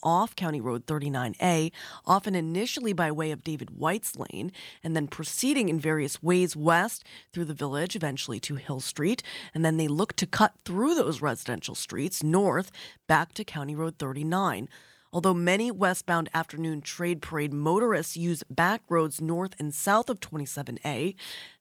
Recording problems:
none

